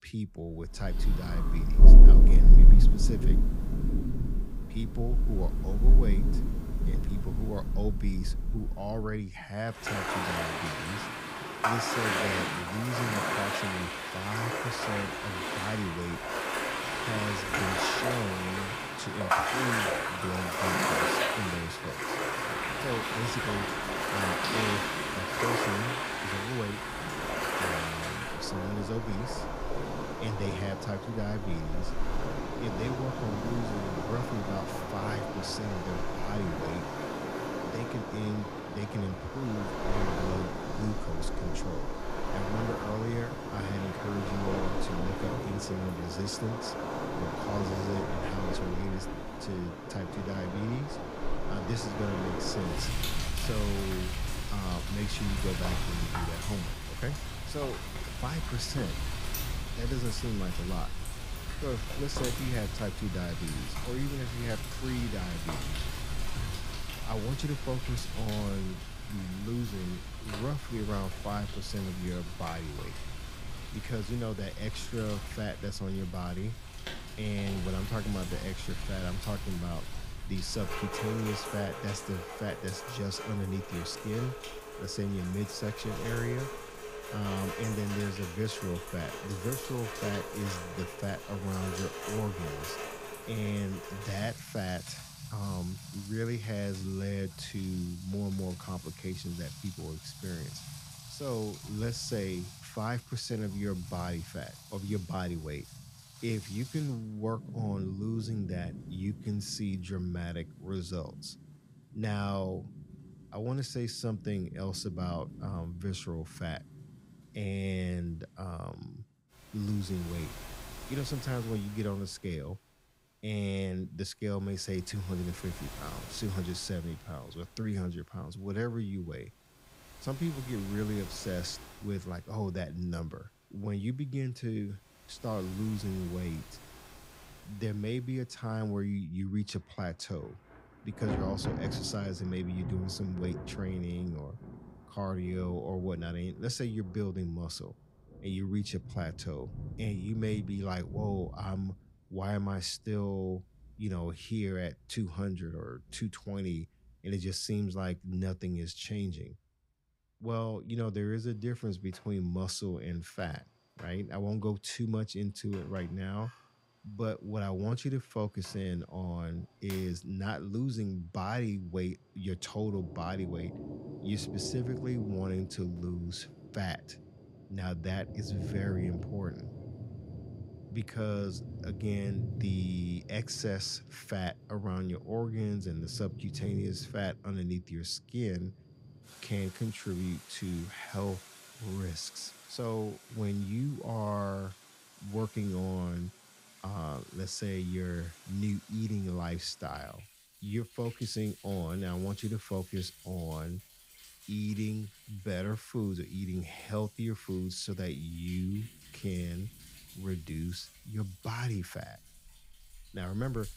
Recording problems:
rain or running water; very loud; throughout; 3 dB above the speech

